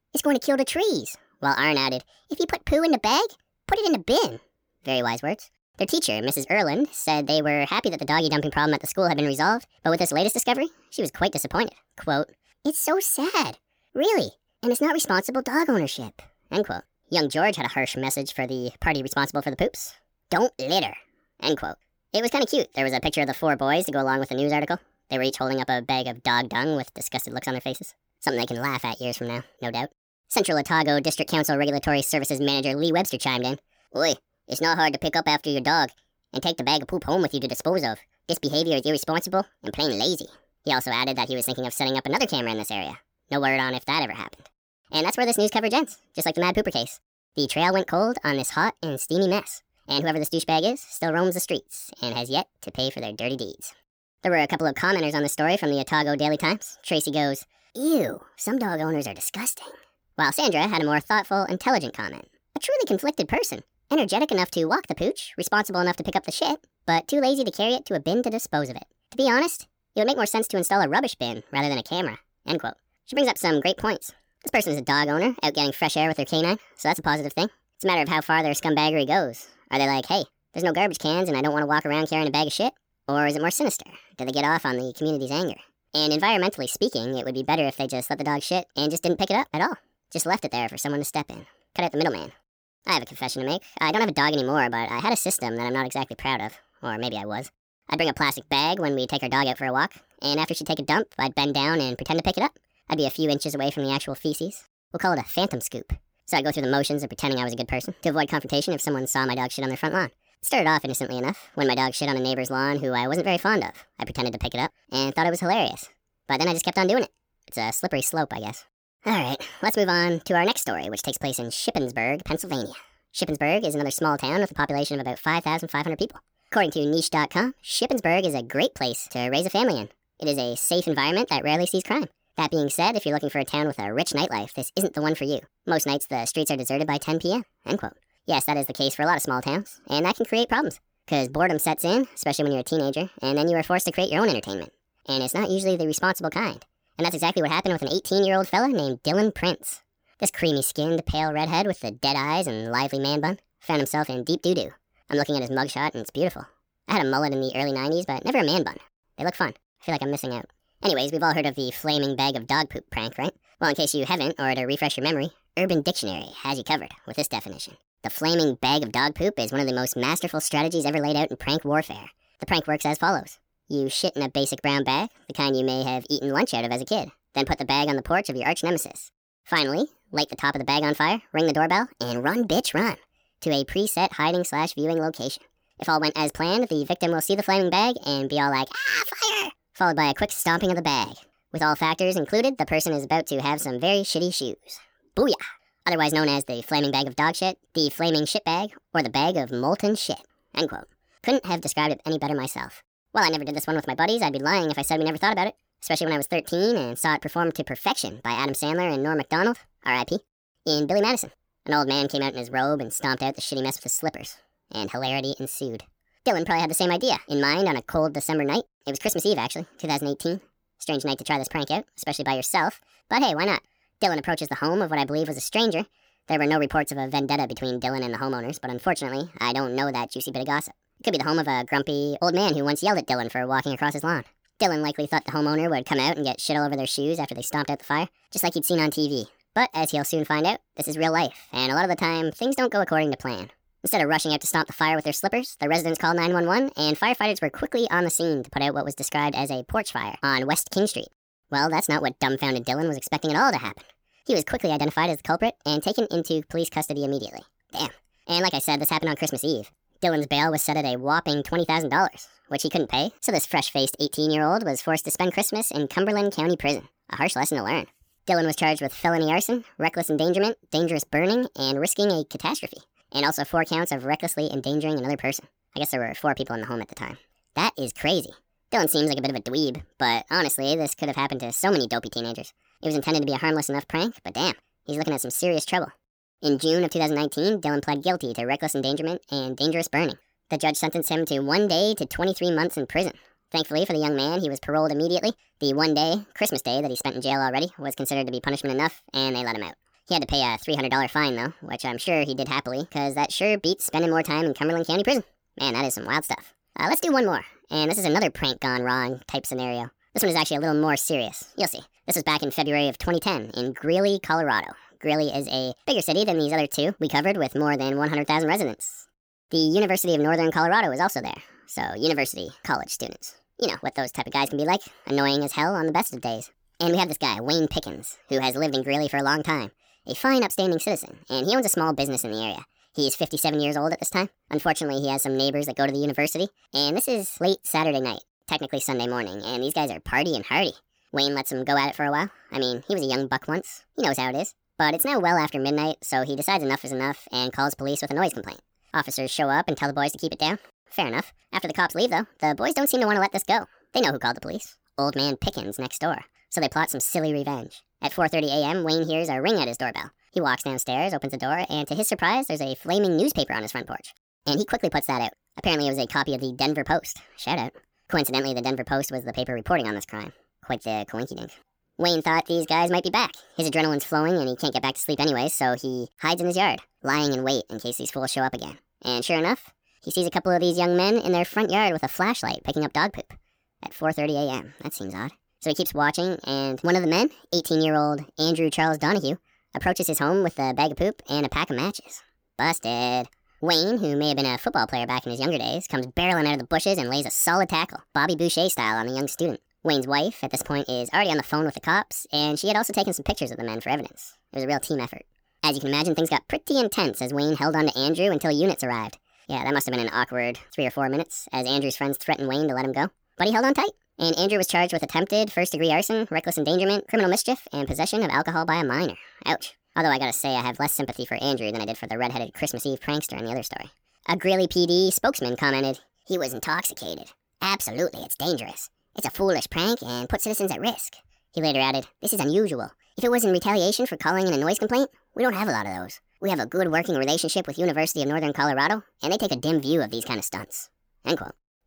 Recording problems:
wrong speed and pitch; too fast and too high; 1.5 times normal speed

